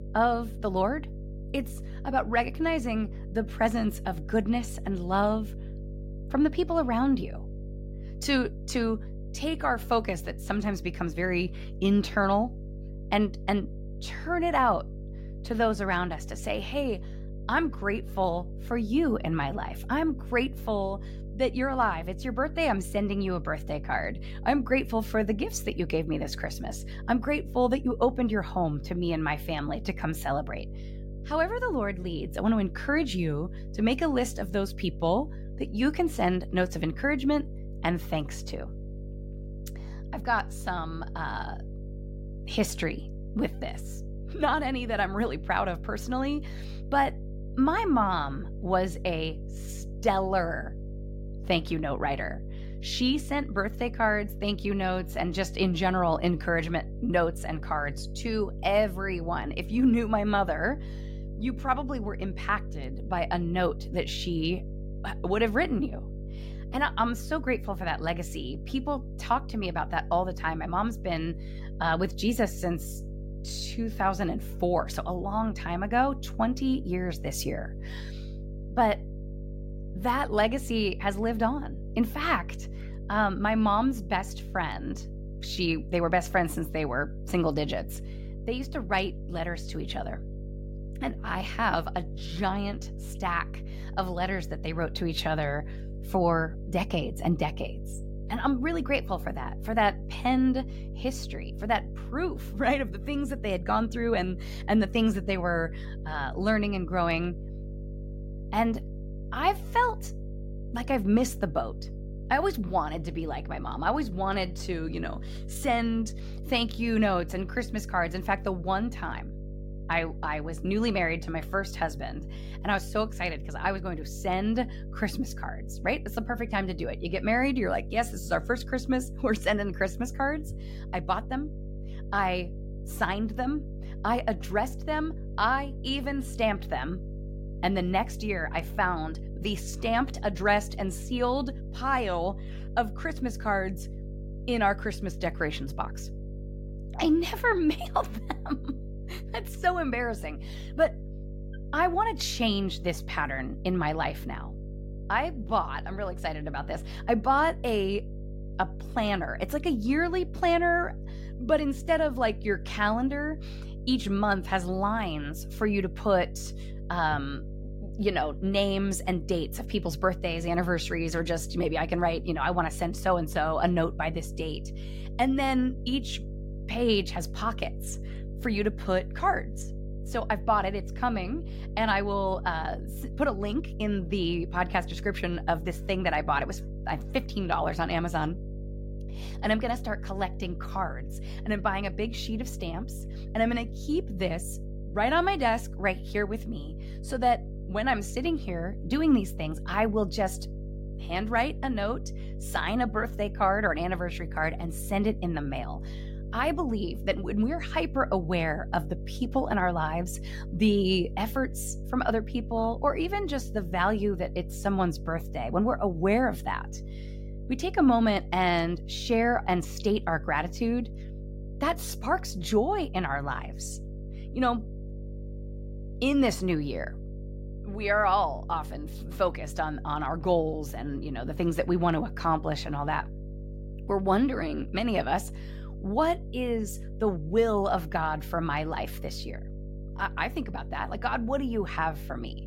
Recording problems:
electrical hum; noticeable; throughout; 50 Hz, 20 dB below the speech

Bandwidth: 16 kHz